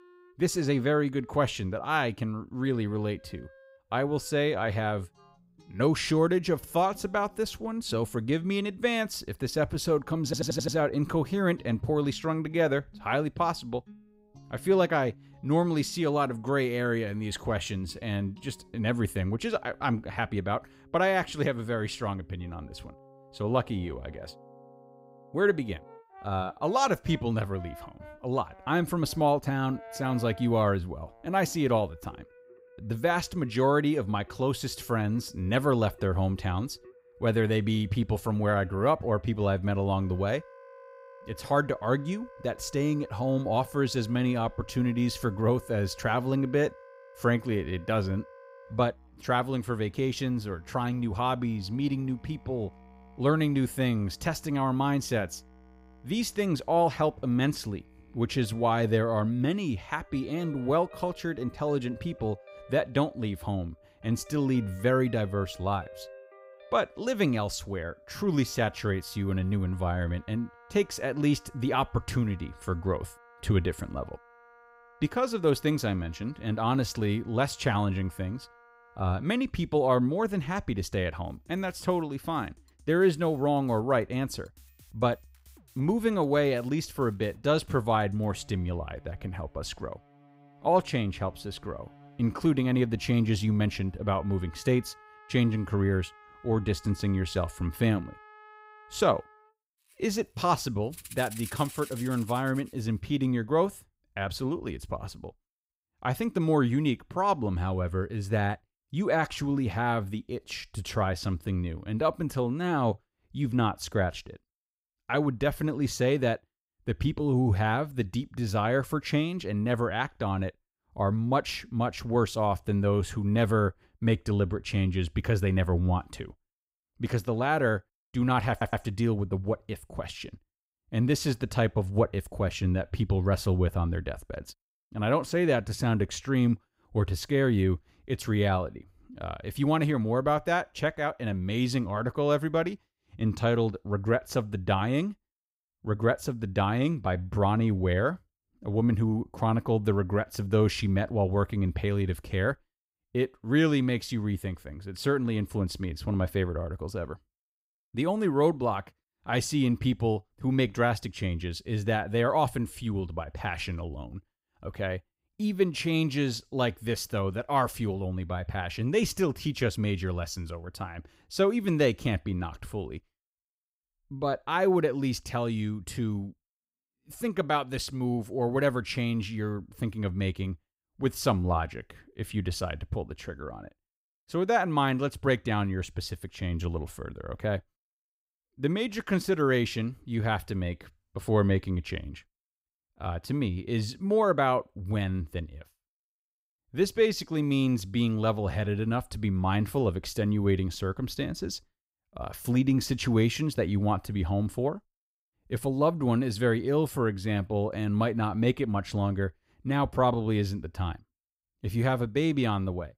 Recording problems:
background music; faint; until 1:43; 25 dB below the speech
audio stuttering; at 10 s and at 2:09

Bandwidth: 15.5 kHz